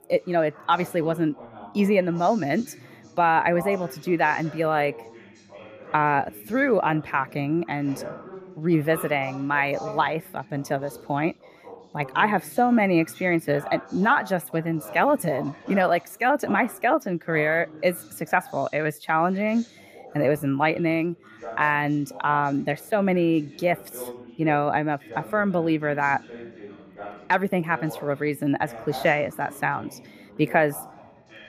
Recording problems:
background chatter; noticeable; throughout; 3 voices, 20 dB below the speech

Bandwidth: 15 kHz